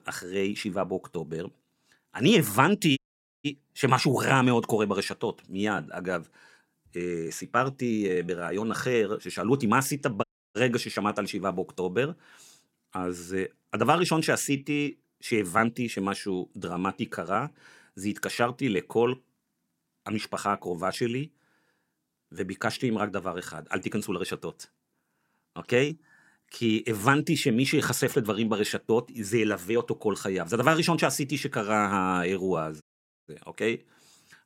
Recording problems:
audio cutting out; at 3 s, at 10 s and at 33 s

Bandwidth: 16.5 kHz